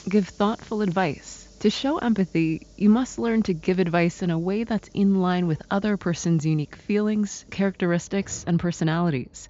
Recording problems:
high frequencies cut off; noticeable; nothing above 7.5 kHz
hiss; faint; throughout; 25 dB below the speech

